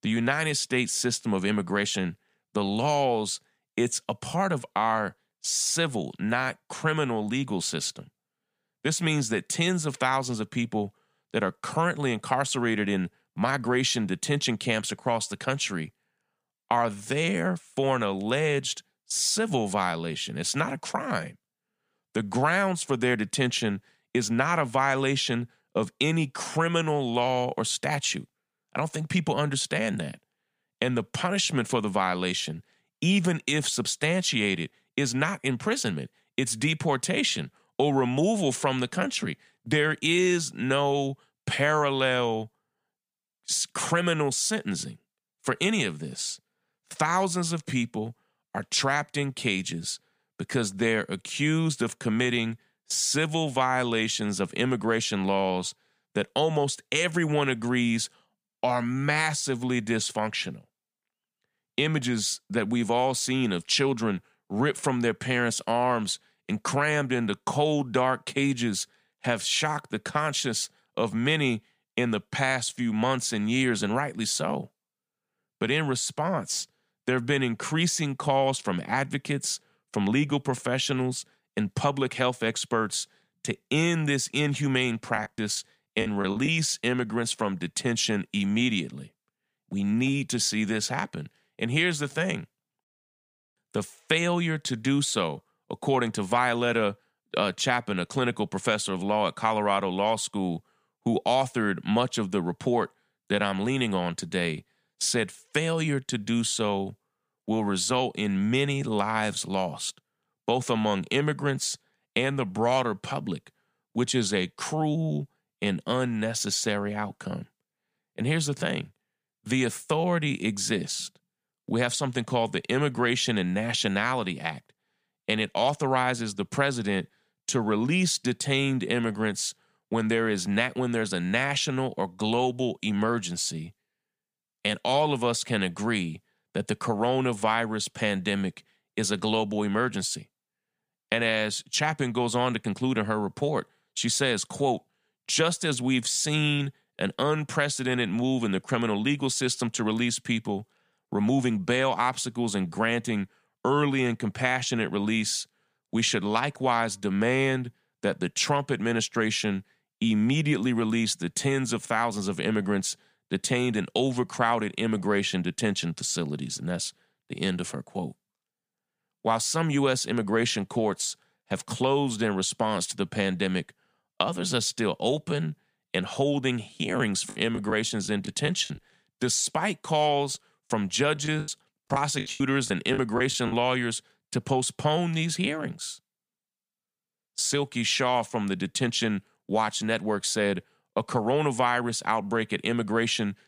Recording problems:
choppy; very; from 1:25 to 1:26, from 2:57 to 2:59 and from 3:01 to 3:04; 16% of the speech affected

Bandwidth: 15 kHz